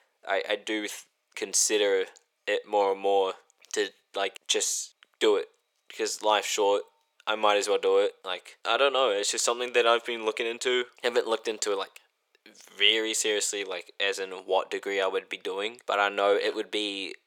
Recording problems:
thin; very; fading below 400 Hz

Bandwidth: 17.5 kHz